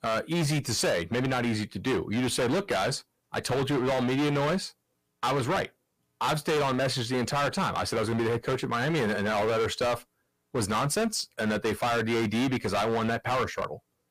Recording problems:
distortion; heavy; 22% of the sound clipped

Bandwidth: 15 kHz